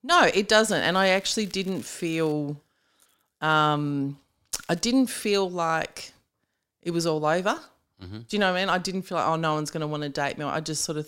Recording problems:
crackling; faint; from 0.5 to 2.5 s and at 4.5 s; 25 dB below the speech

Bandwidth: 16 kHz